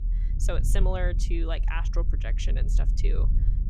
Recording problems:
low rumble; noticeable; throughout; 10 dB below the speech

